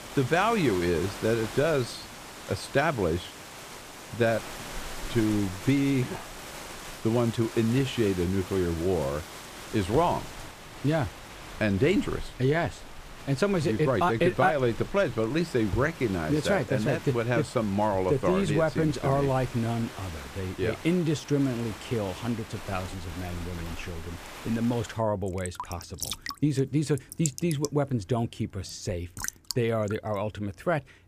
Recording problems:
rain or running water; noticeable; throughout; 15 dB below the speech

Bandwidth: 15 kHz